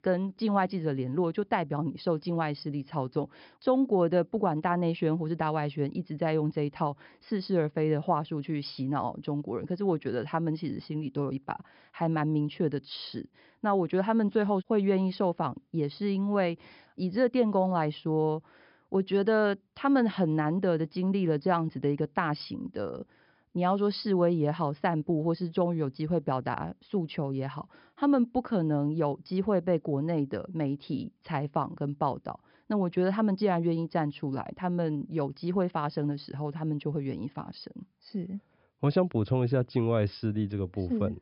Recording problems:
high frequencies cut off; noticeable; nothing above 5.5 kHz

